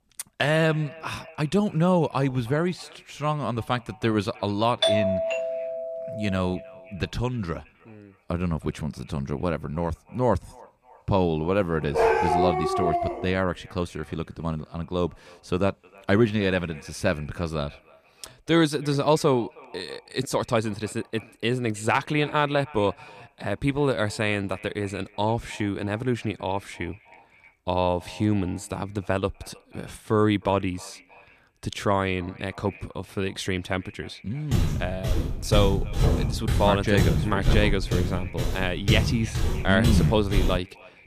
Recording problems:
echo of what is said; faint; throughout; 310 ms later, 25 dB below the speech
doorbell; loud; from 5 to 6.5 s; peak 4 dB above the speech
dog barking; loud; from 12 to 13 s; peak 5 dB above the speech
footsteps; loud; from 35 s on; peak 3 dB above the speech

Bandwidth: 14.5 kHz